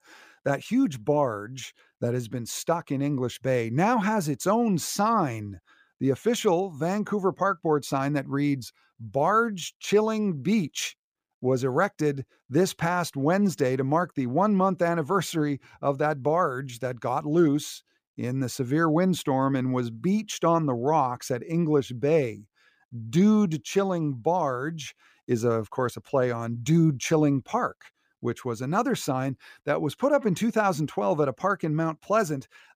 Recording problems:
none

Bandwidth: 15 kHz